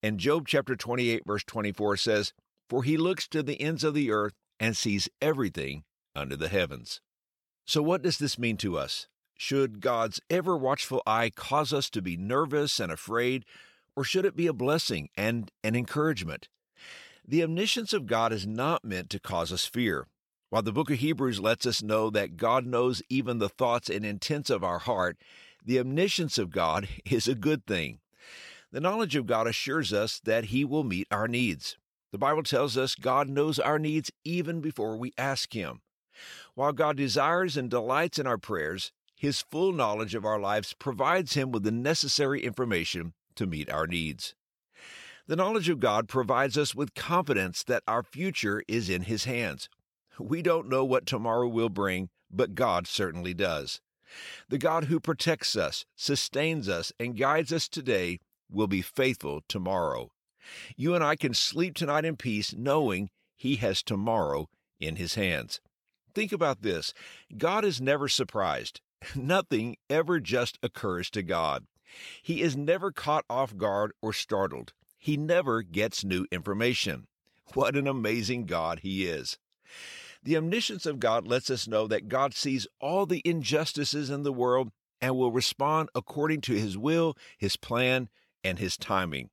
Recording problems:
none

